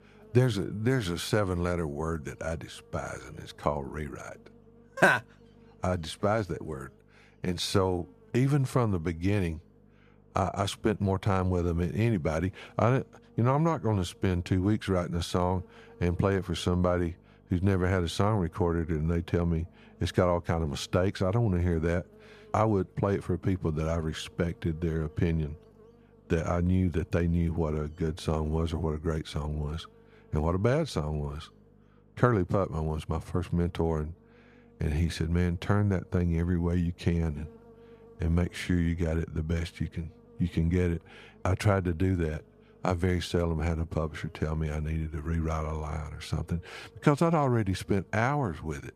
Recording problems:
electrical hum; faint; throughout; 50 Hz, 30 dB below the speech

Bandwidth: 14.5 kHz